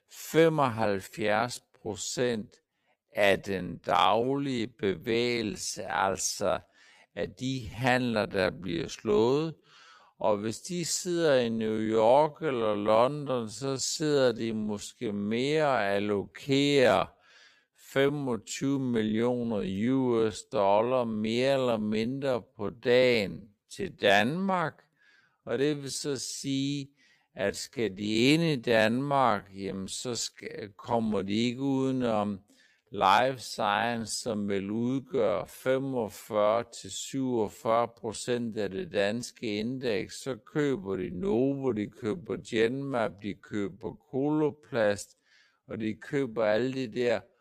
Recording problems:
wrong speed, natural pitch; too slow; 0.5 times normal speed

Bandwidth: 15 kHz